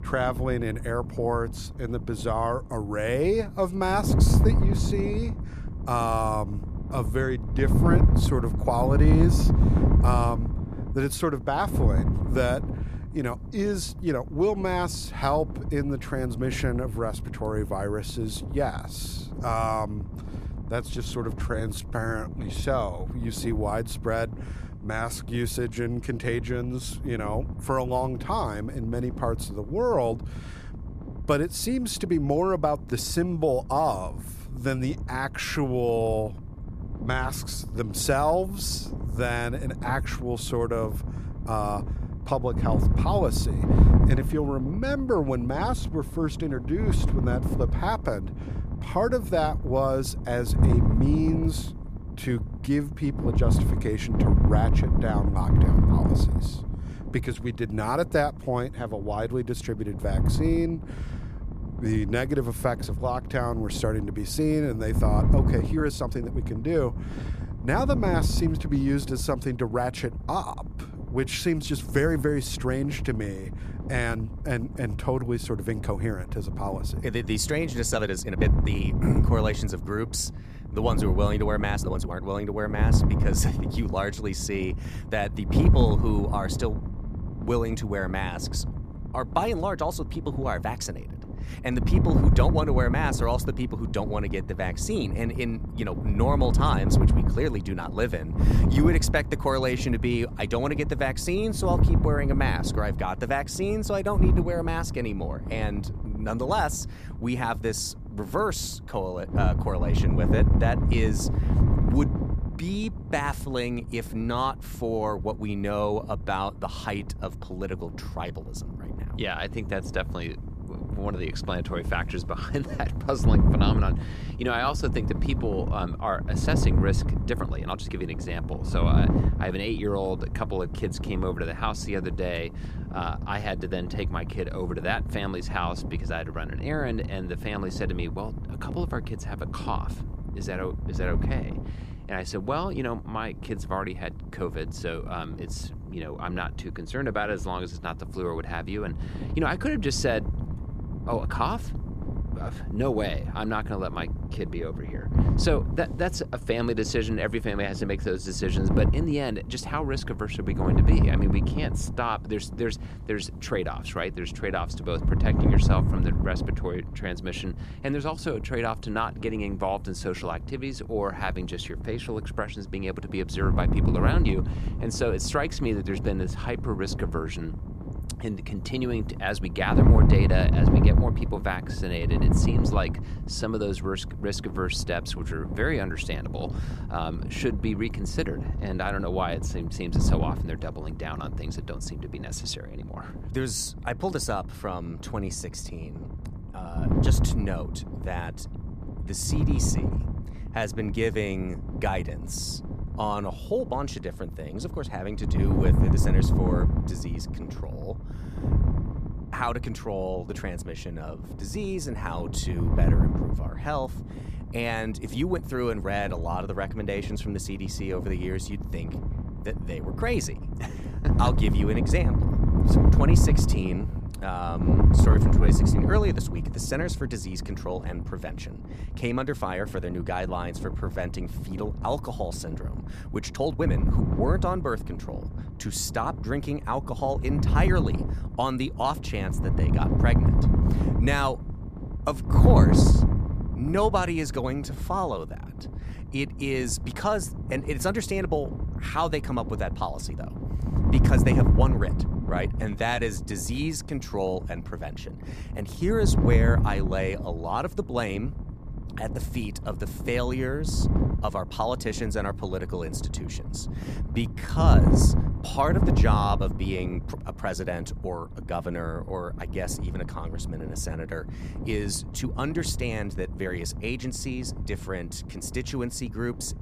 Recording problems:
wind noise on the microphone; heavy; 8 dB below the speech
uneven, jittery; strongly; from 21 s to 4:25

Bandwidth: 14.5 kHz